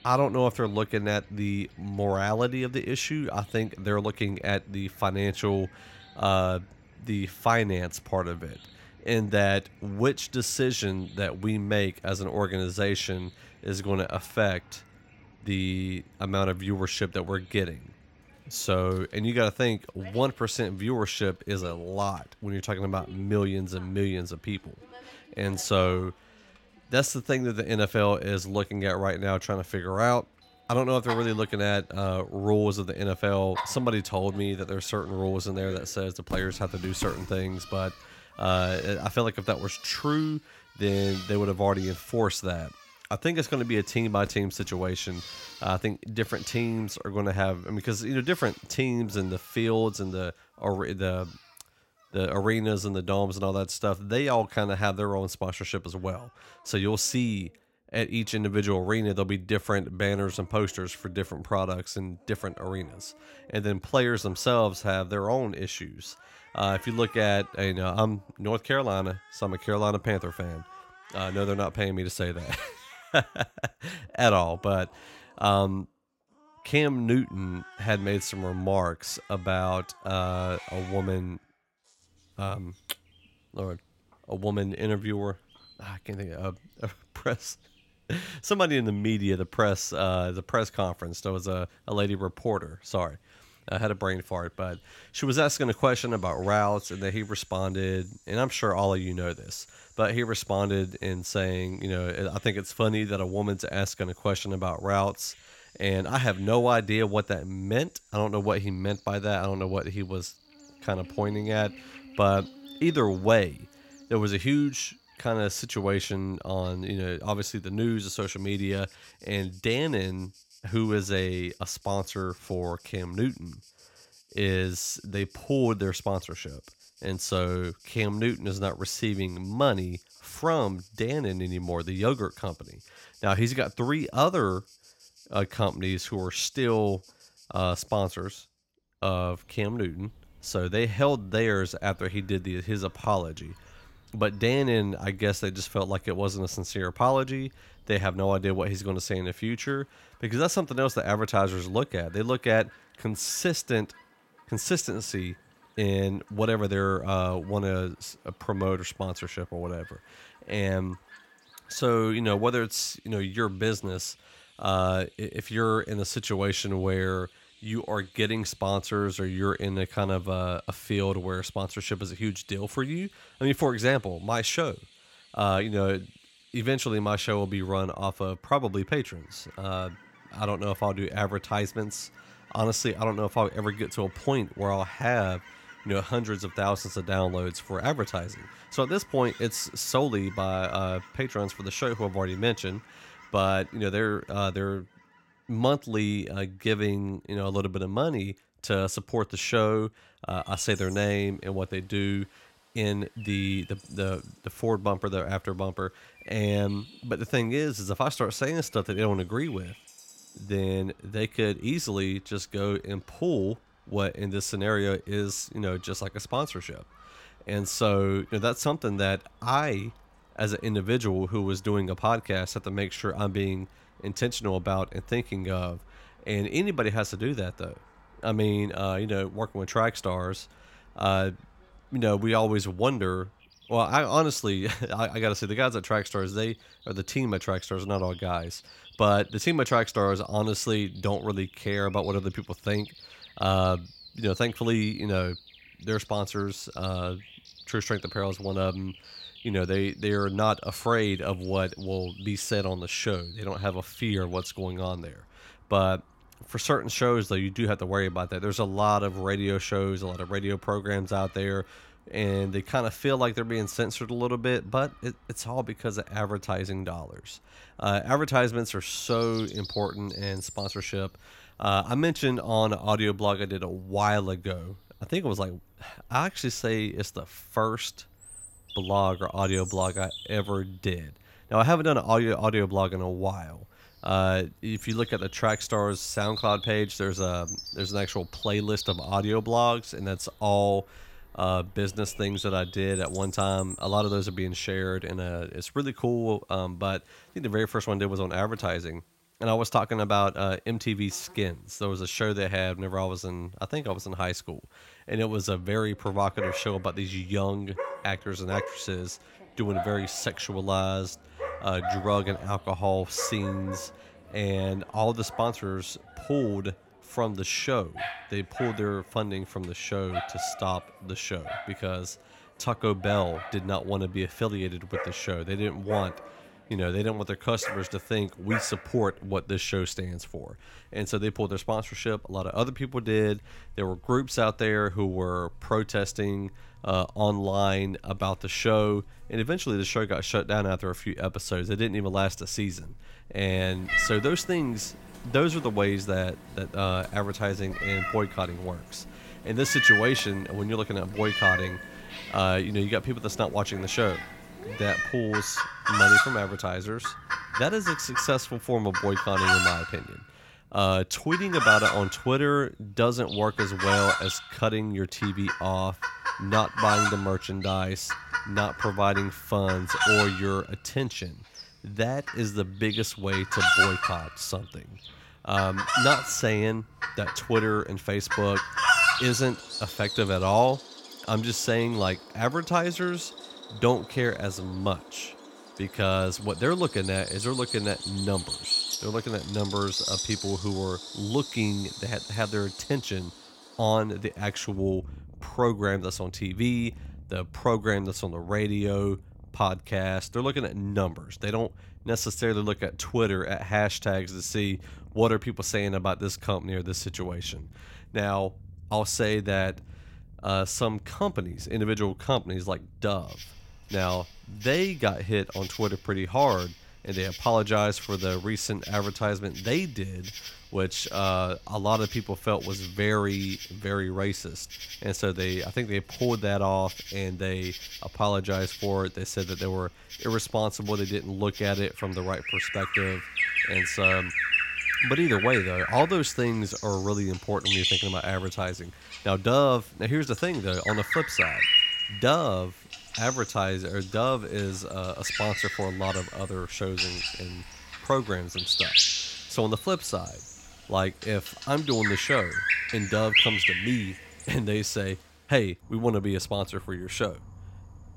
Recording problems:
animal sounds; loud; throughout; 2 dB below the speech

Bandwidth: 16.5 kHz